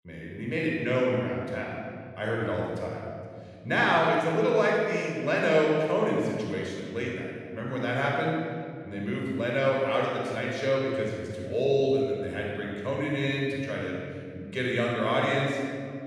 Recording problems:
room echo; strong; dies away in 2.1 s
off-mic speech; somewhat distant

